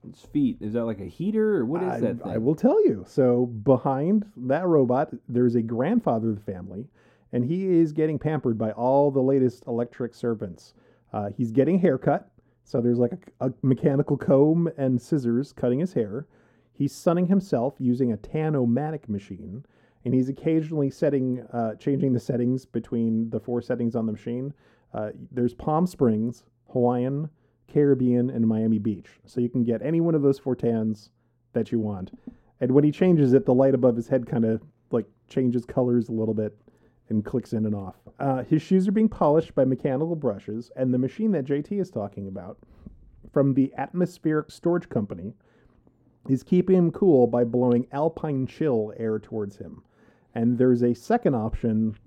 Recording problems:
muffled; very; fading above 1.5 kHz

